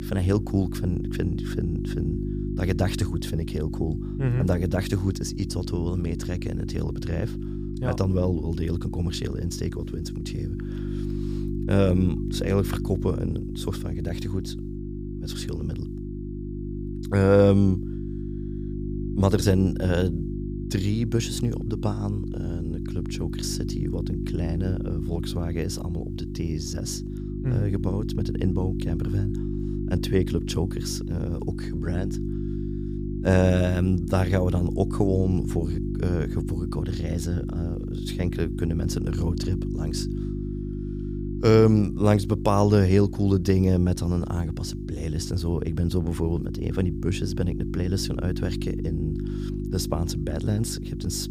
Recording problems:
electrical hum; loud; throughout; 50 Hz, 8 dB below the speech

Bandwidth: 15 kHz